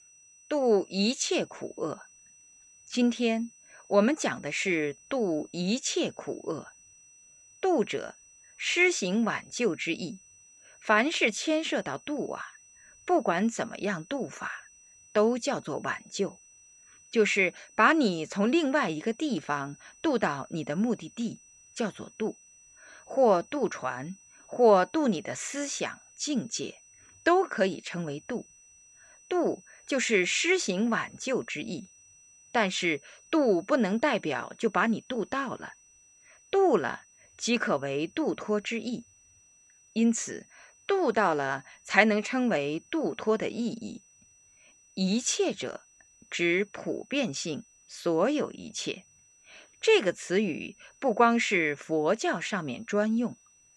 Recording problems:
high-pitched whine; faint; throughout; 6 kHz, 25 dB below the speech

